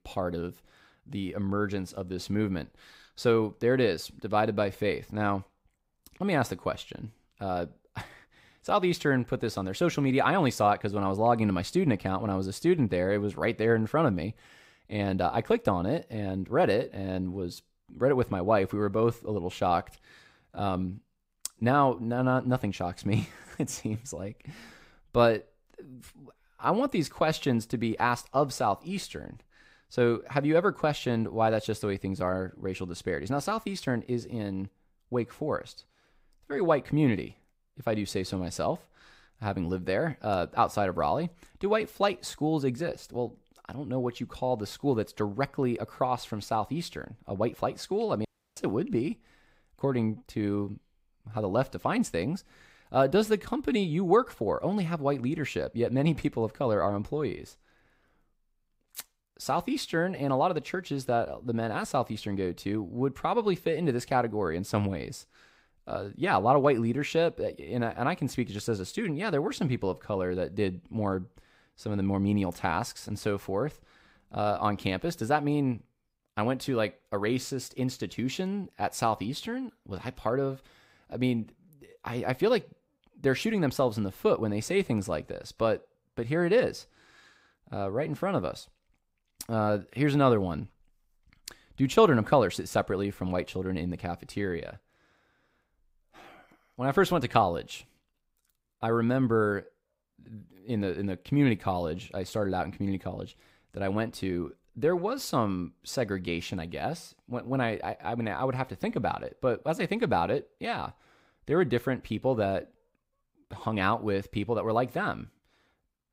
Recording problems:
audio cutting out; at 48 s

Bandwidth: 15.5 kHz